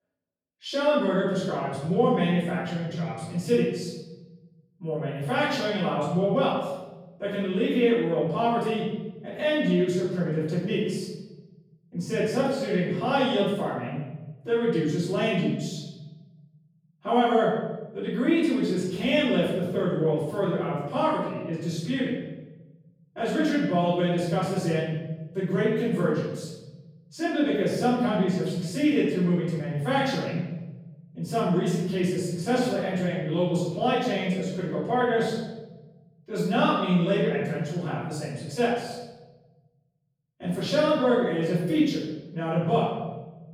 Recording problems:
room echo; strong; dies away in 1.4 s
off-mic speech; far

